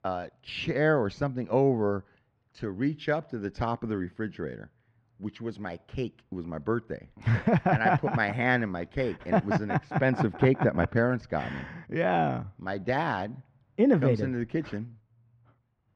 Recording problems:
muffled; slightly; fading above 2.5 kHz

